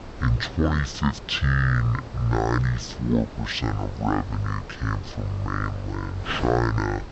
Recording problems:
wrong speed and pitch; too slow and too low; 0.5 times normal speed
wind noise on the microphone; occasional gusts; 15 dB below the speech

